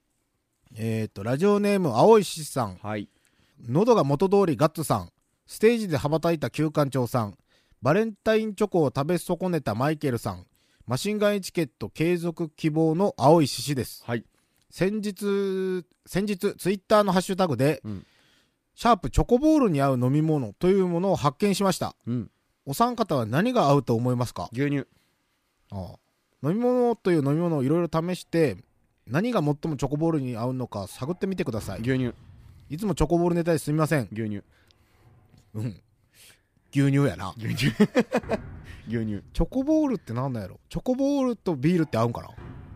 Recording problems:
household noises; faint; throughout; 25 dB below the speech

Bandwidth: 15 kHz